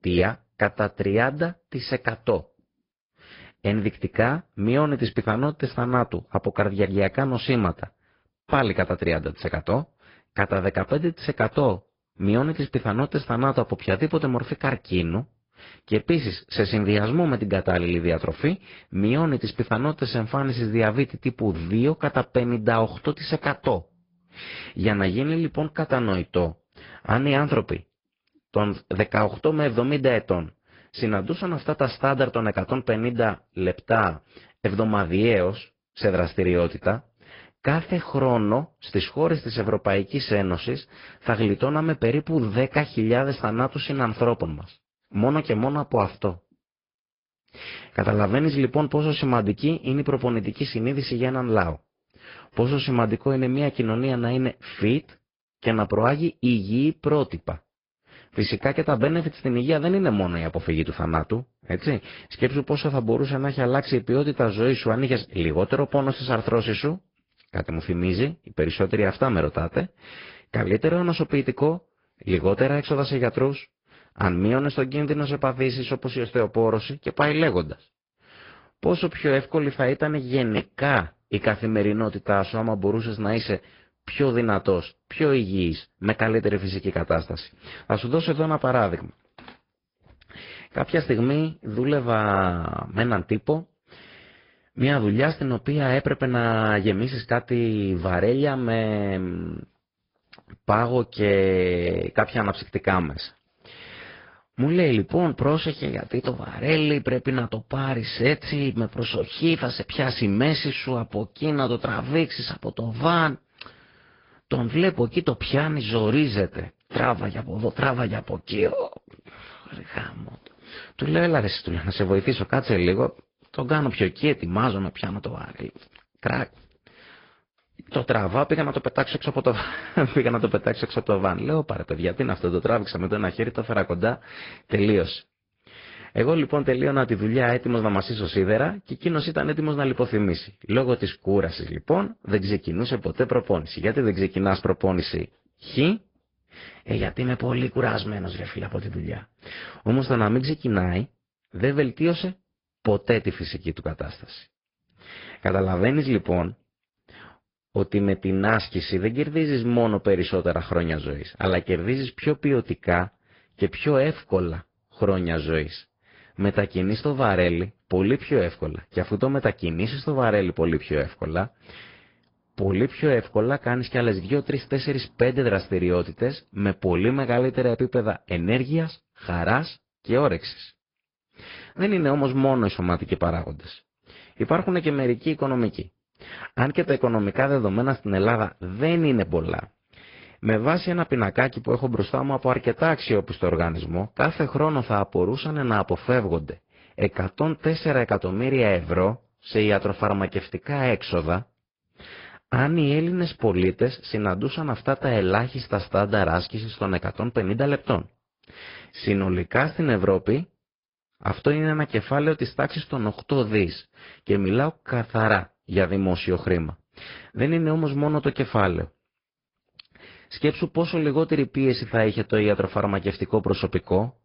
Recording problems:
high frequencies cut off; noticeable; nothing above 5 kHz
garbled, watery; slightly

